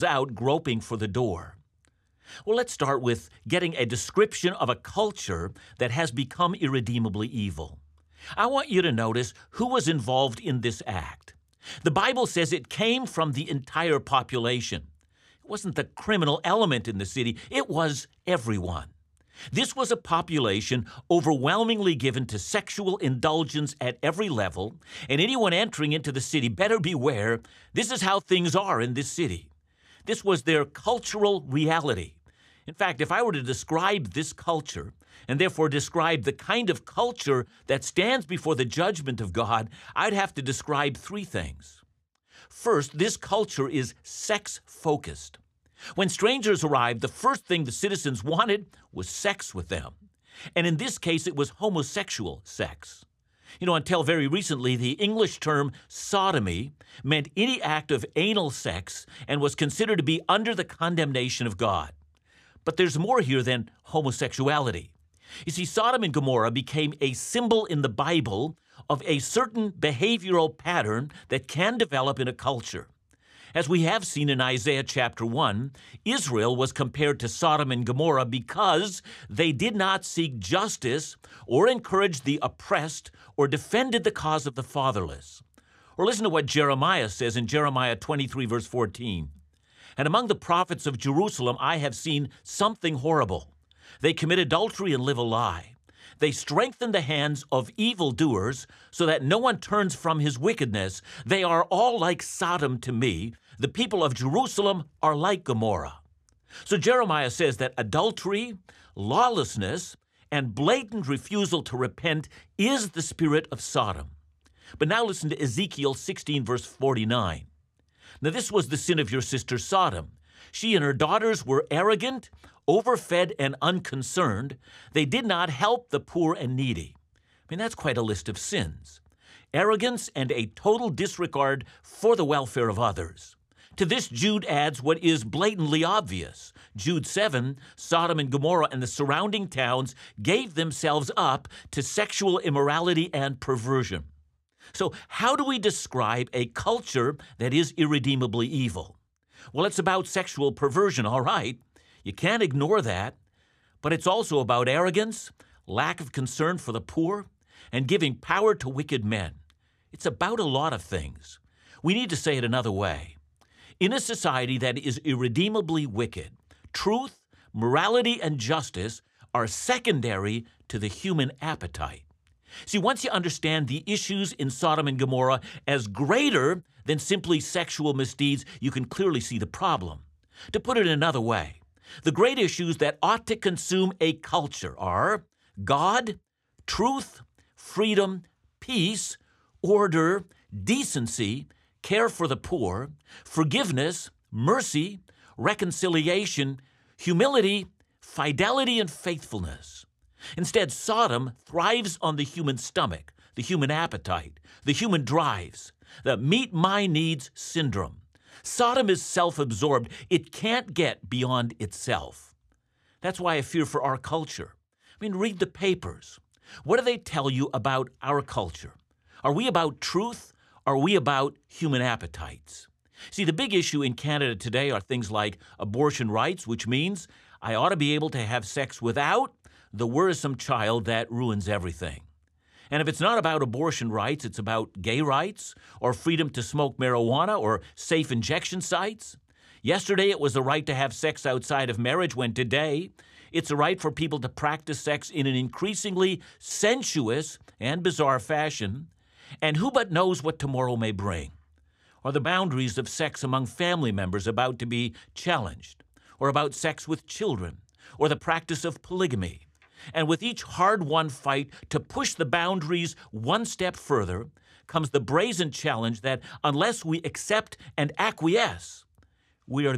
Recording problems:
abrupt cut into speech; at the start and the end

